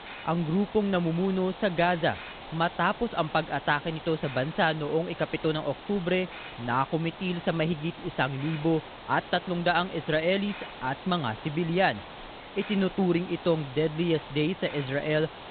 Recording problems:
high frequencies cut off; severe; nothing above 4 kHz
hiss; noticeable; throughout; 15 dB below the speech

